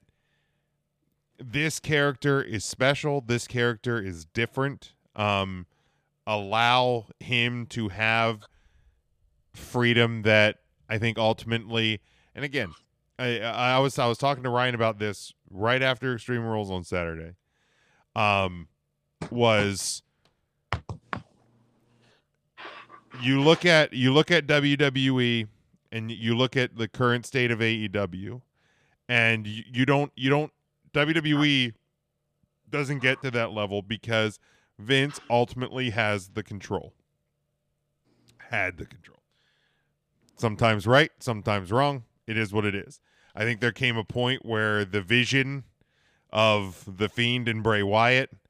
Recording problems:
none

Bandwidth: 15 kHz